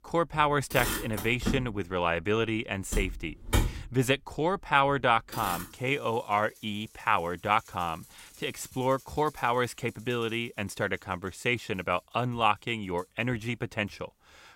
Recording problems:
traffic noise; loud; throughout; 5 dB below the speech

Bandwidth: 16 kHz